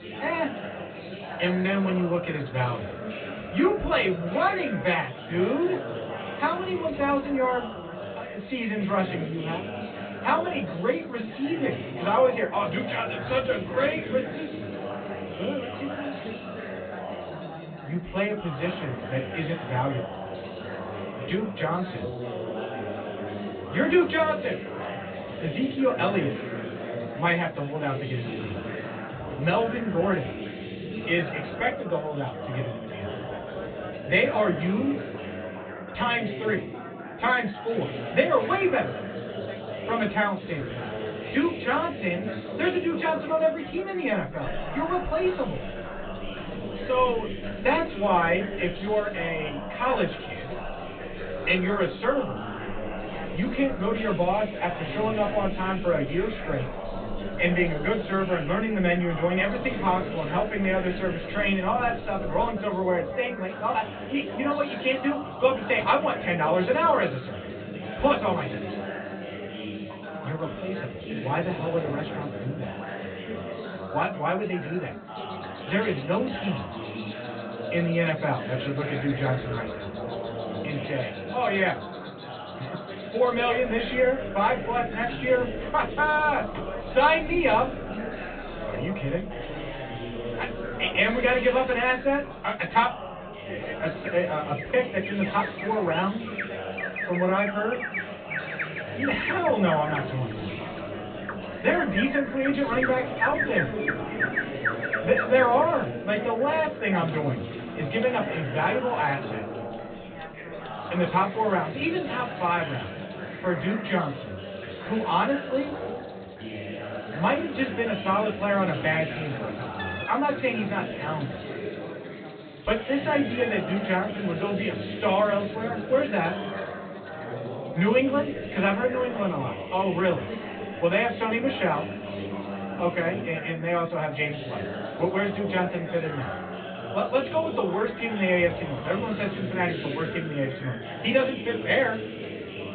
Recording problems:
off-mic speech; far
high frequencies cut off; severe; nothing above 4 kHz
room echo; very slight; dies away in 0.2 s
animal sounds; loud; from 44 s on; 10 dB below the speech
background chatter; loud; throughout; 4 voices, 8 dB below the speech

